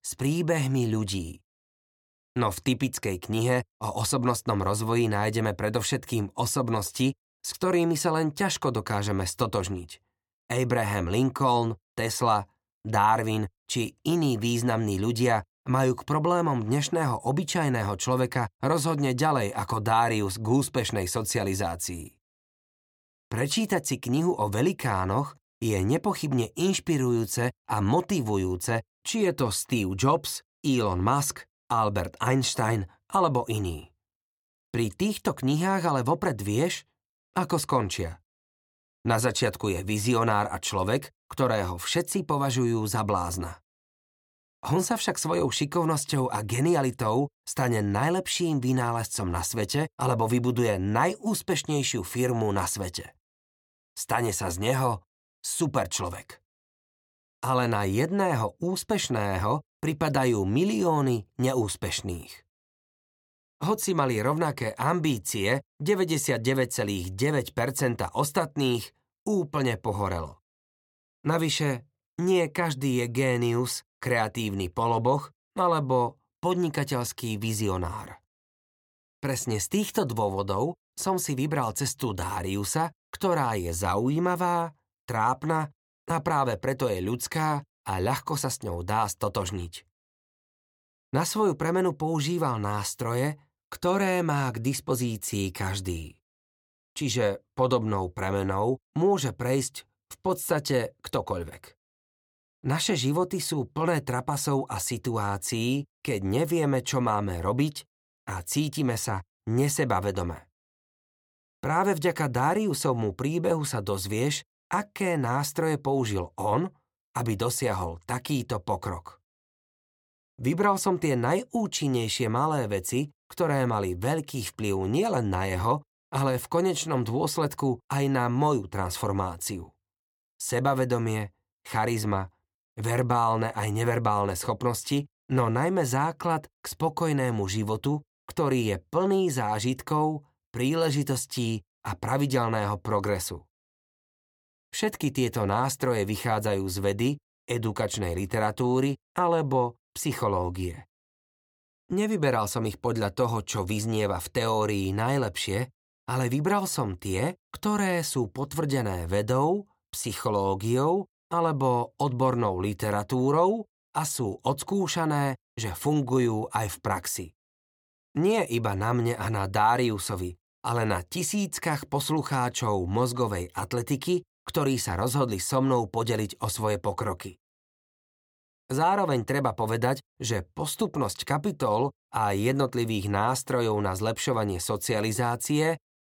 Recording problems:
none

